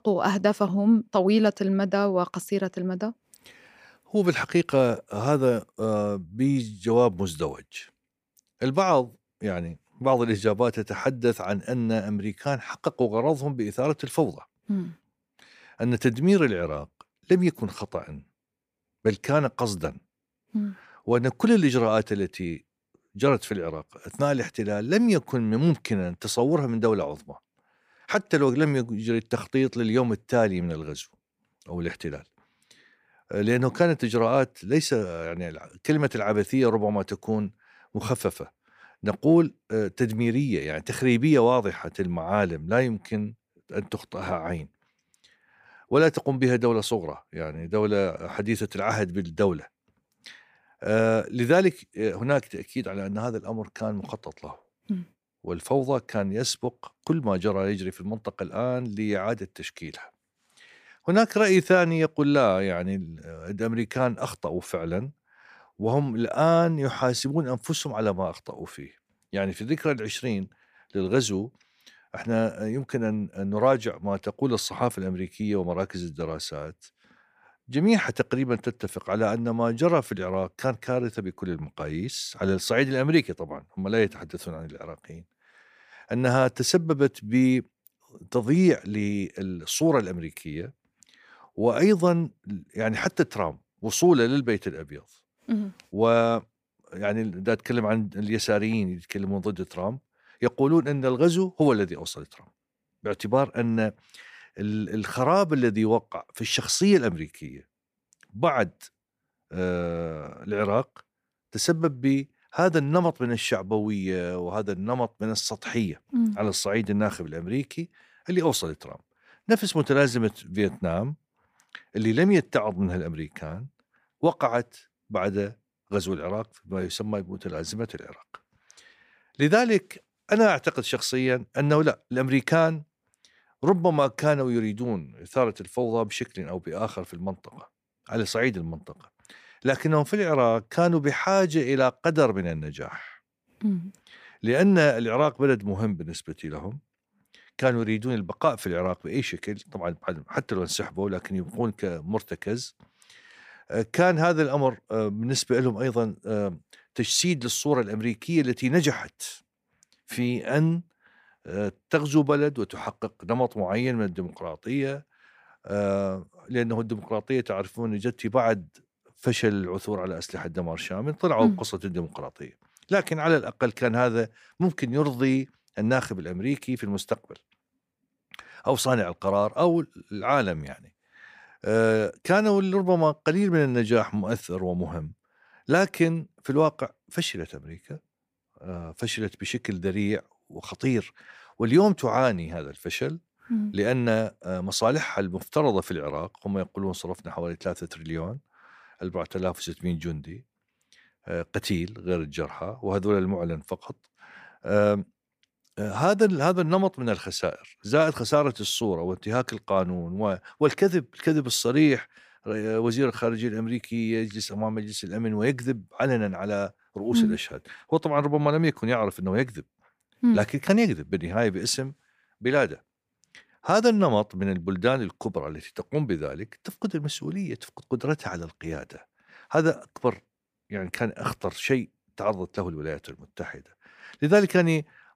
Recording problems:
none

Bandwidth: 15 kHz